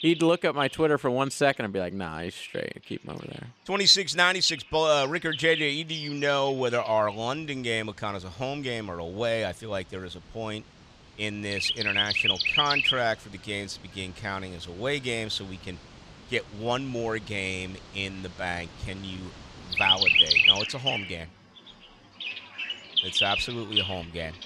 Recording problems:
animal sounds; very loud; throughout; 4 dB above the speech

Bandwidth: 14.5 kHz